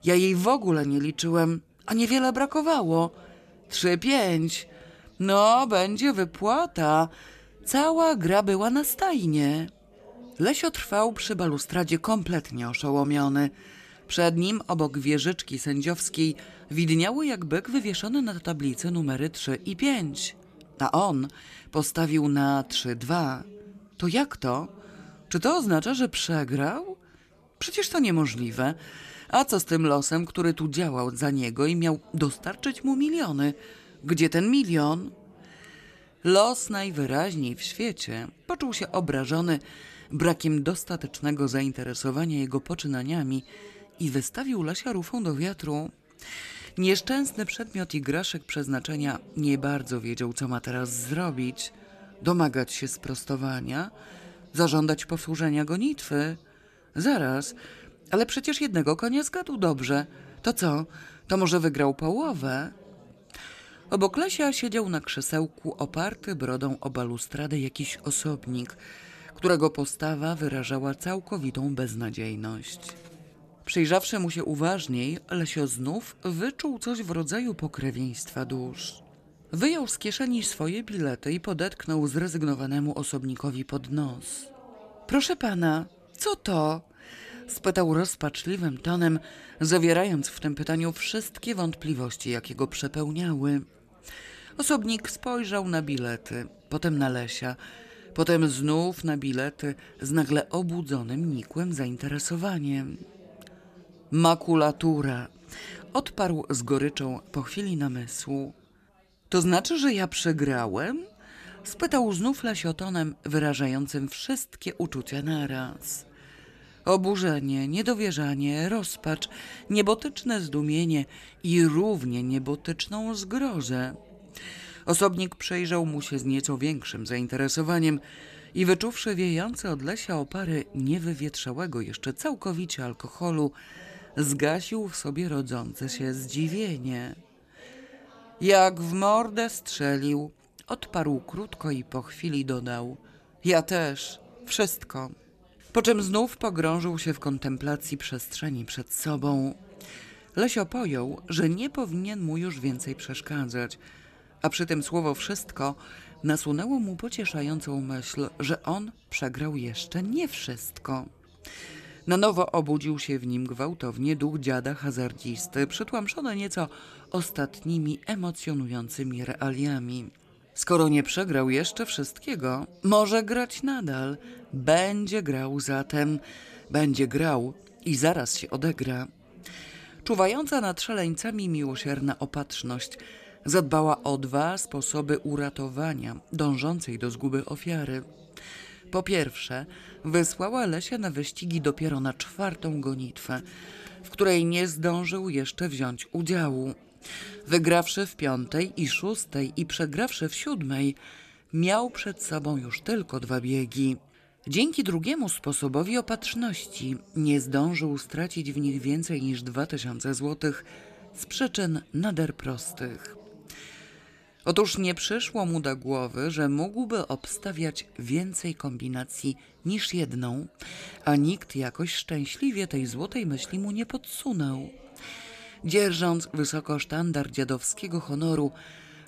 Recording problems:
background chatter; faint; throughout; 4 voices, 25 dB below the speech

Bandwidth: 14 kHz